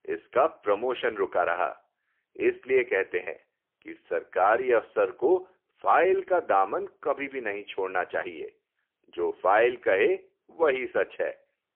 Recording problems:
phone-call audio; poor line

